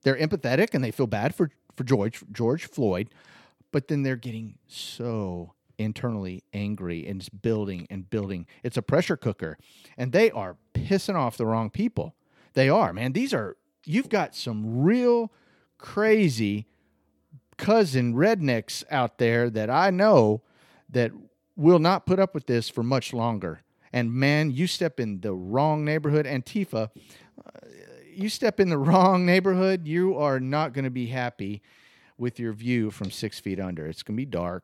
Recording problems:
none

